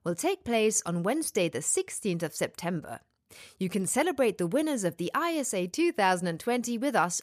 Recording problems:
none

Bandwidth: 14.5 kHz